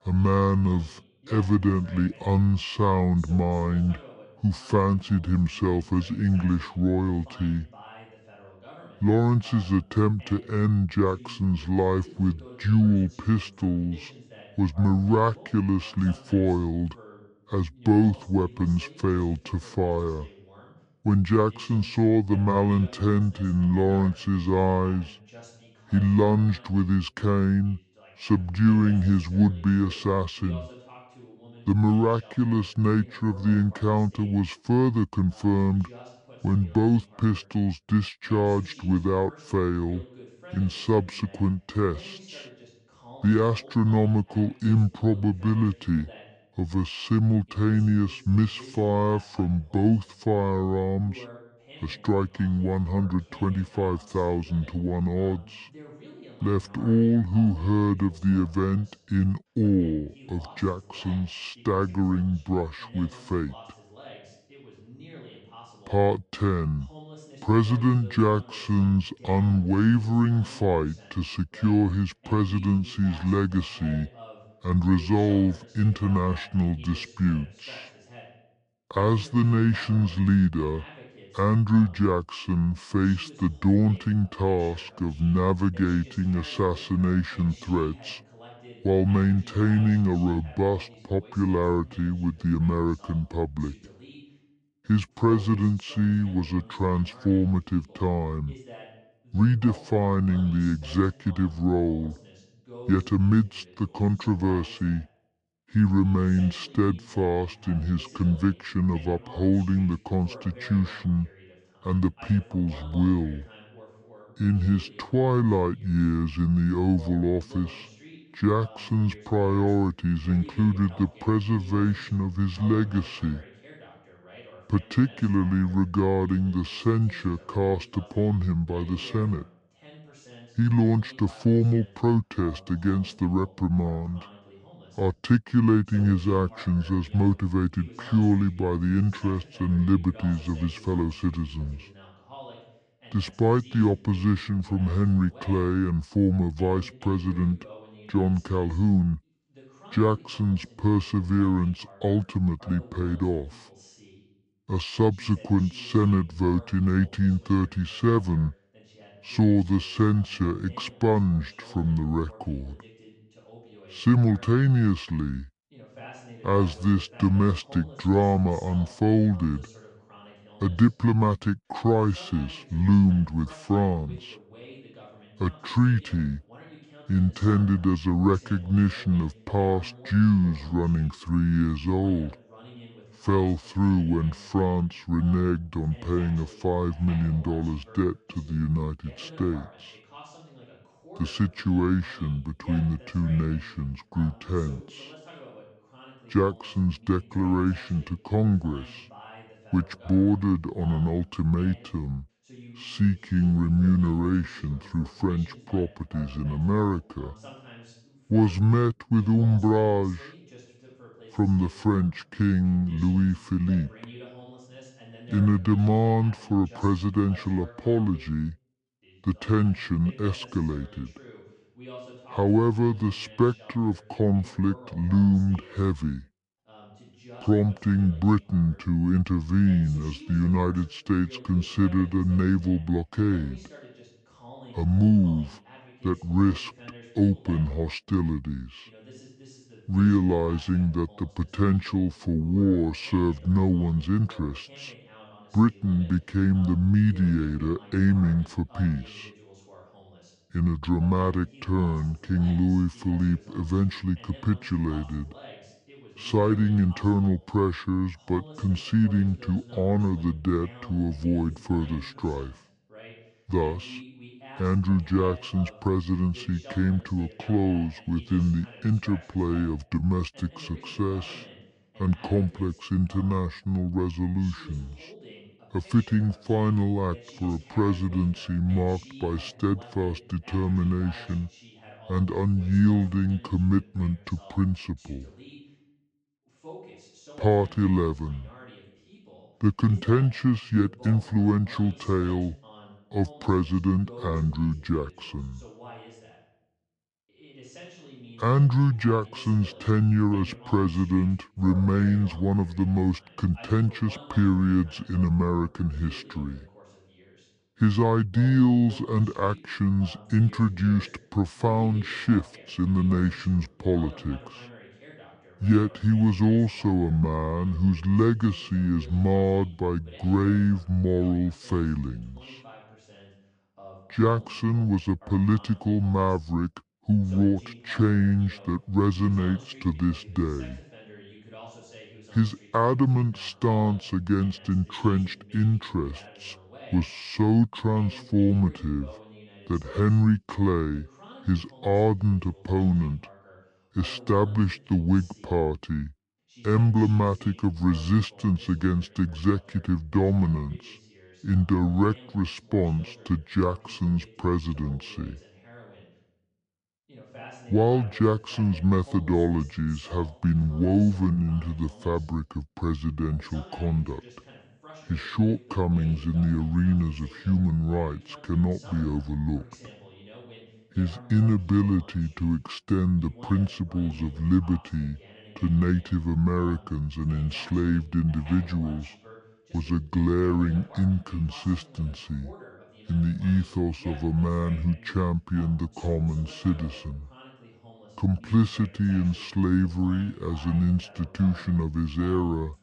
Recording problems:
wrong speed and pitch; too slow and too low; 0.7 times normal speed
voice in the background; faint; throughout; 25 dB below the speech

